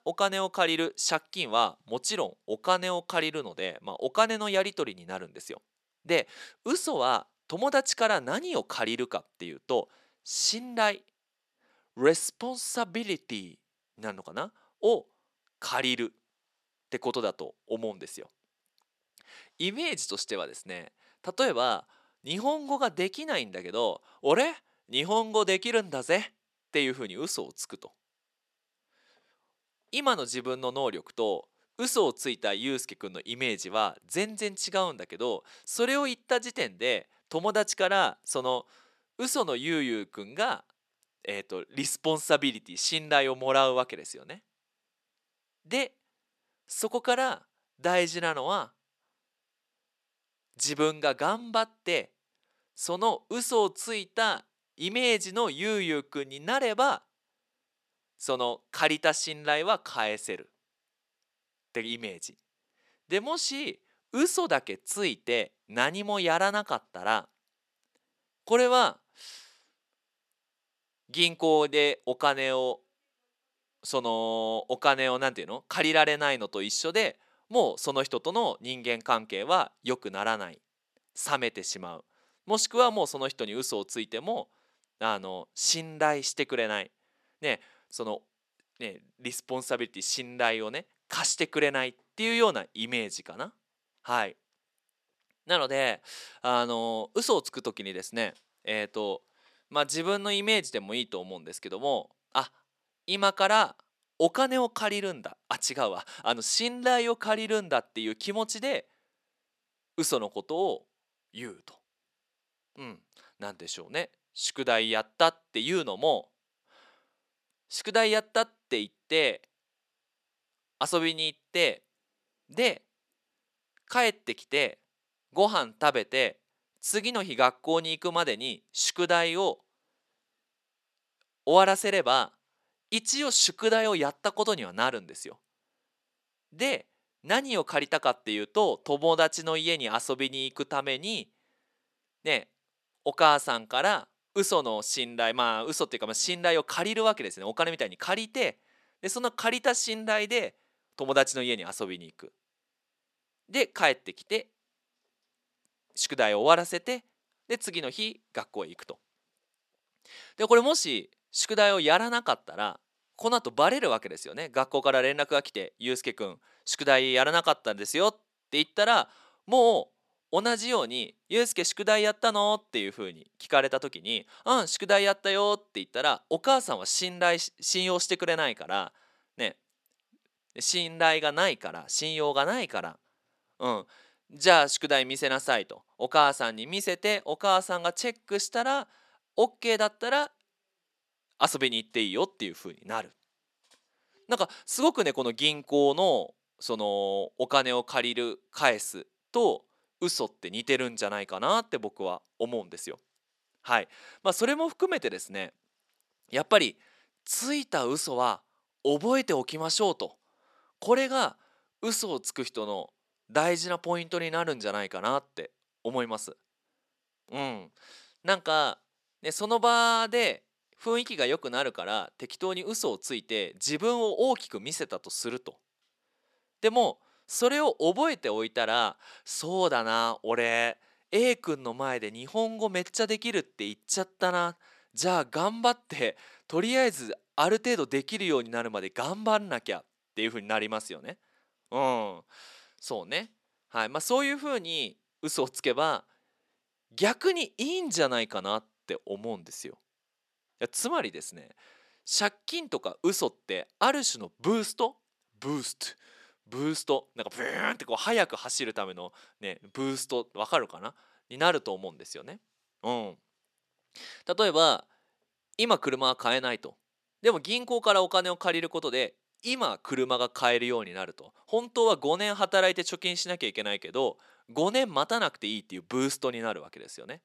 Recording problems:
thin; somewhat; fading below 400 Hz

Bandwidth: 13.5 kHz